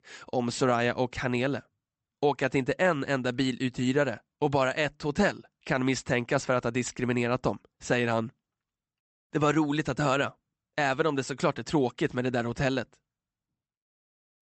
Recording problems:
high frequencies cut off; noticeable; nothing above 8 kHz

